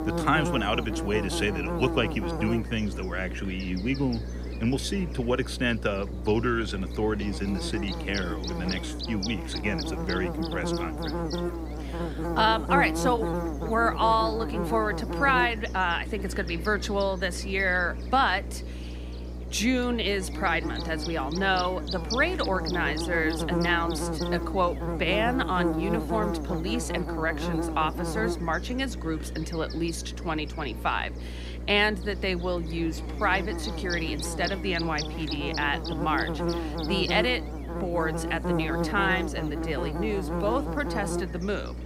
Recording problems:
electrical hum; loud; throughout; 60 Hz, 8 dB below the speech

